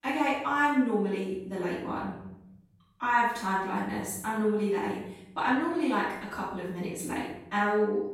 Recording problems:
room echo; strong; dies away in 0.9 s
off-mic speech; far

